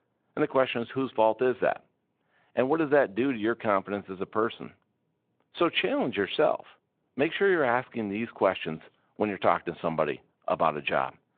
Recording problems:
phone-call audio

